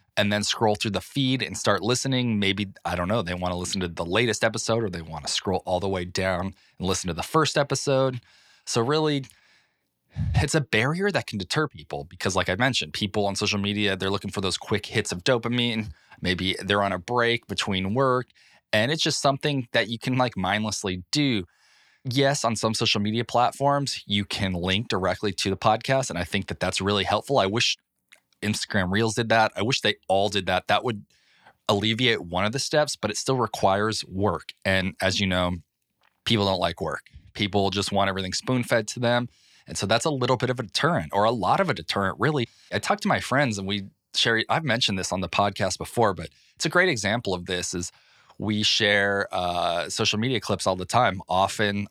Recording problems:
none

